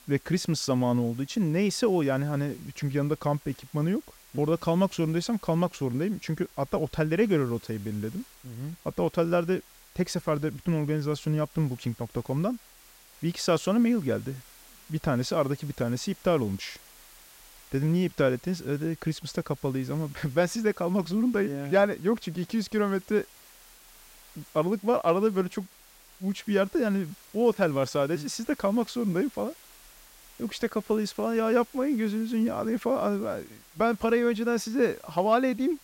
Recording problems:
hiss; faint; throughout; 25 dB below the speech

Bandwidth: 16 kHz